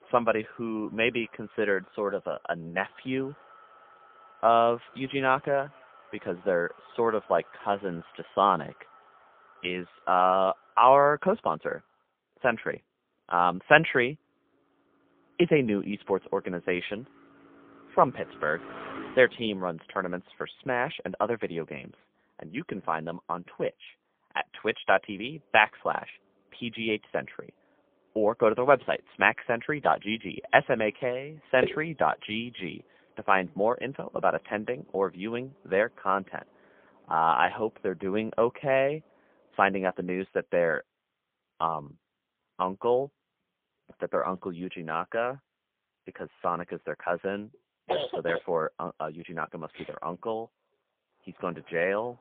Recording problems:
phone-call audio; poor line; nothing above 3.5 kHz
traffic noise; faint; throughout; 25 dB below the speech

